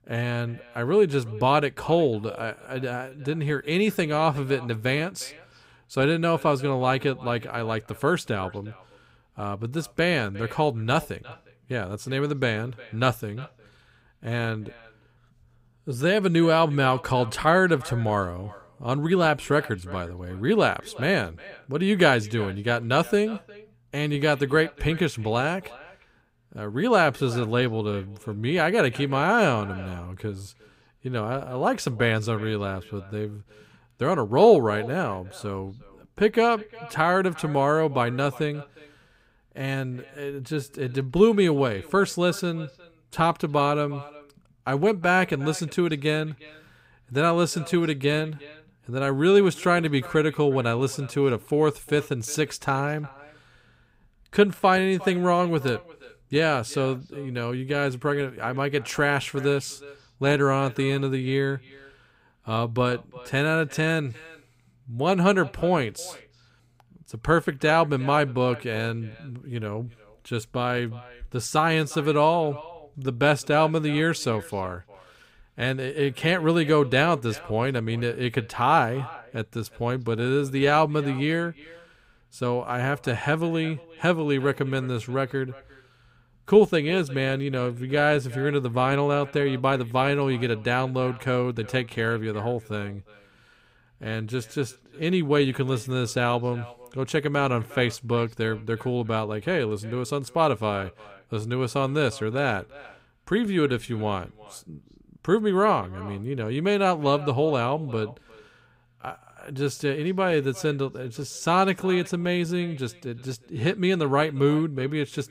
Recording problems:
echo of what is said; faint; throughout; 360 ms later, 20 dB below the speech

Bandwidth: 15.5 kHz